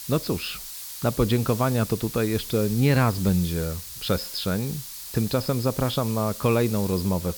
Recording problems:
high frequencies cut off; noticeable; nothing above 5.5 kHz
hiss; loud; throughout; 10 dB below the speech

